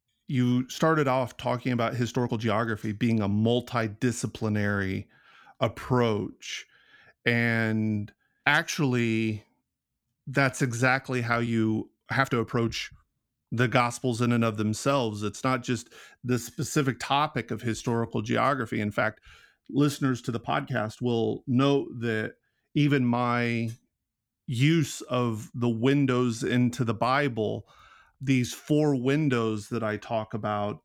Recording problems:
uneven, jittery; strongly; from 2 to 30 s

